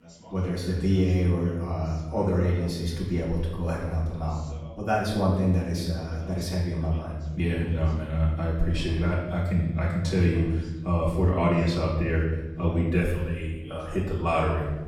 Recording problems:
off-mic speech; far
room echo; noticeable; dies away in 1 s
background chatter; faint; throughout; 2 voices, 20 dB below the speech

